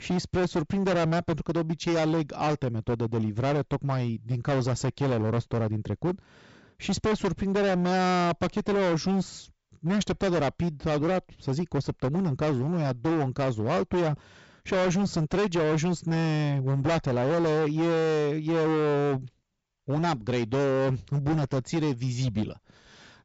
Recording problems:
distortion; heavy; 24% of the sound clipped
high frequencies cut off; noticeable; nothing above 8 kHz

